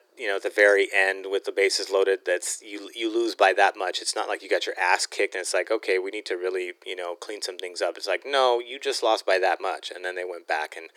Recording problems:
thin; very; fading below 350 Hz

